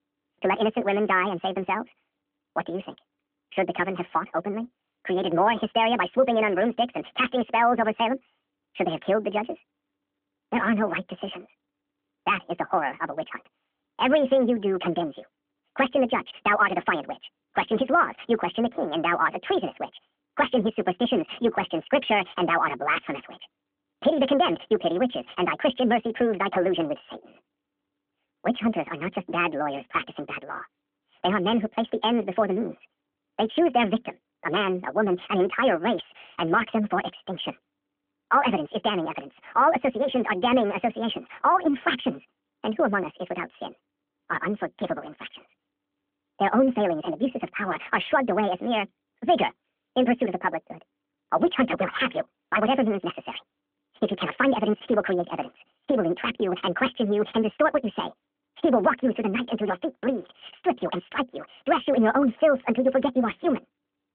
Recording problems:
wrong speed and pitch; too fast and too high; 1.6 times normal speed
phone-call audio; nothing above 3.5 kHz

